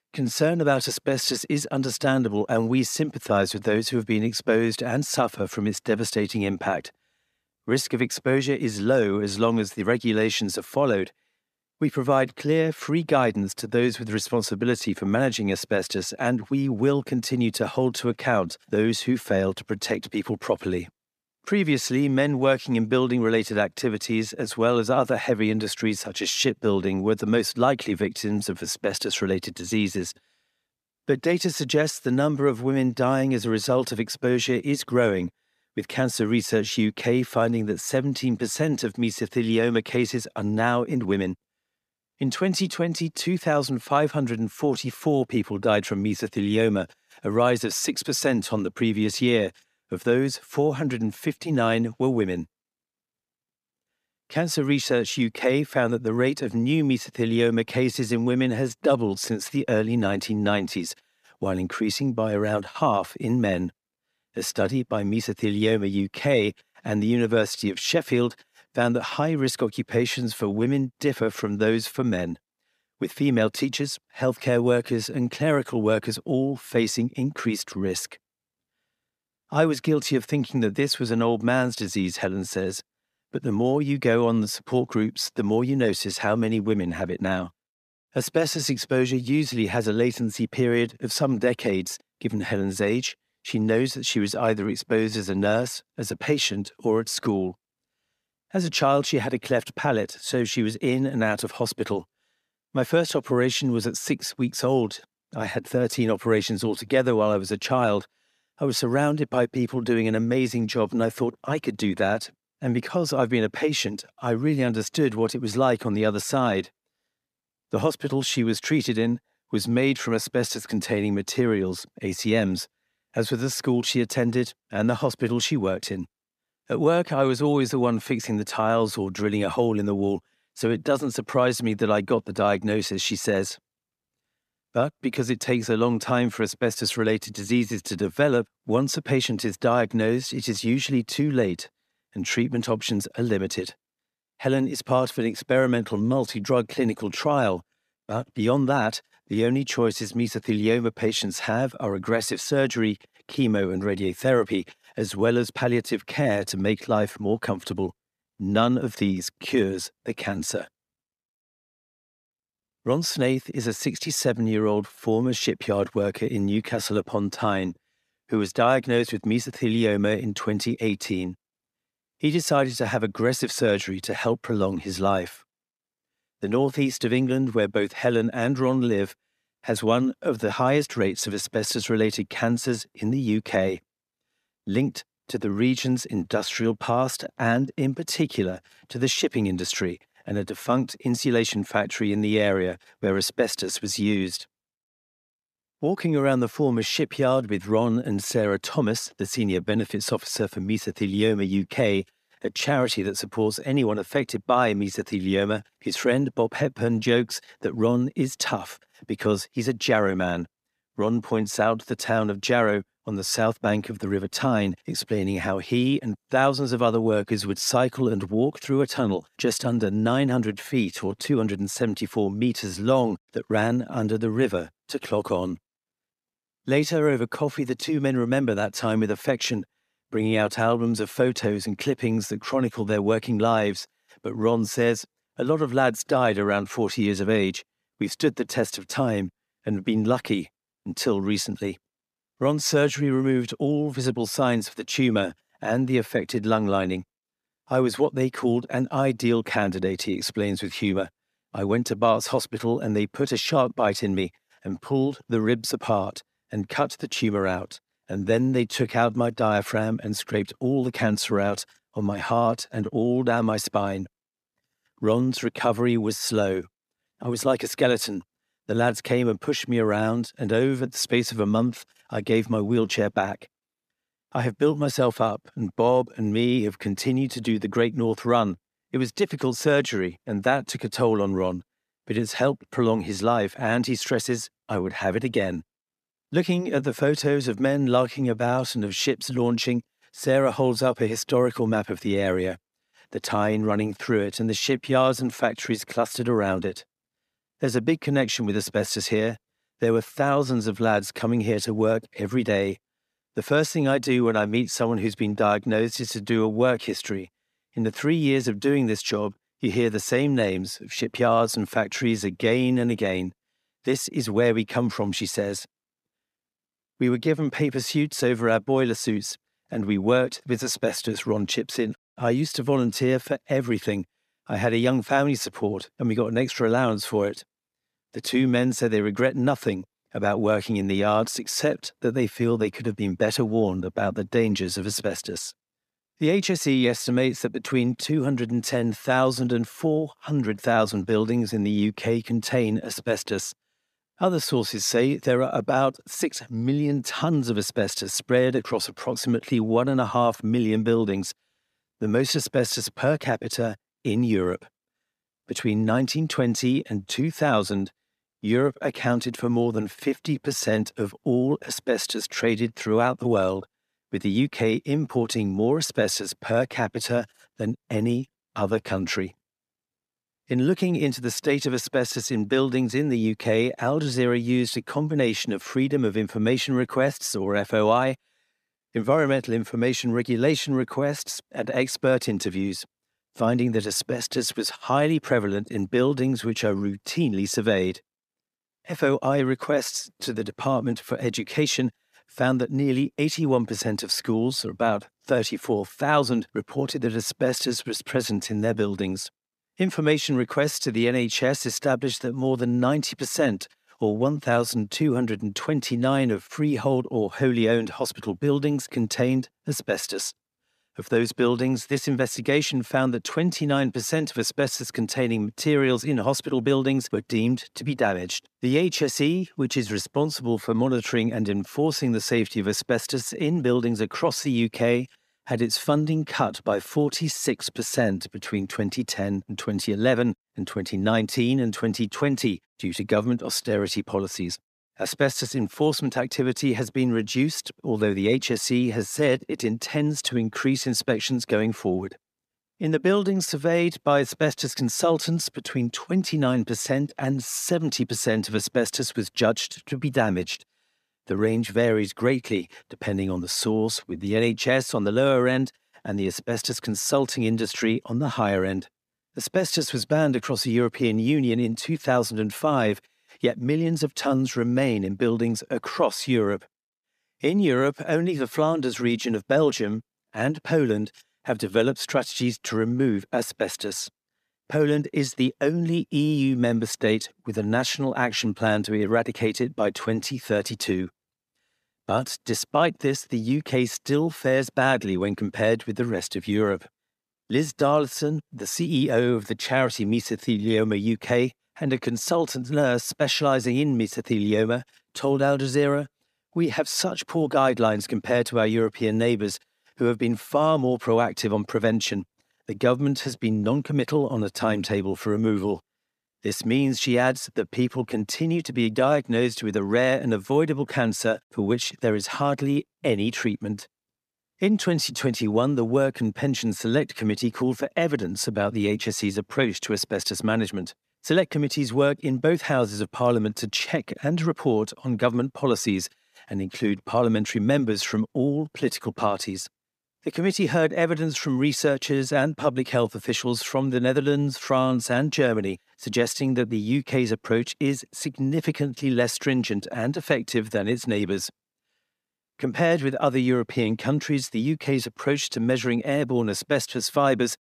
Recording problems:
none

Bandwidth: 14.5 kHz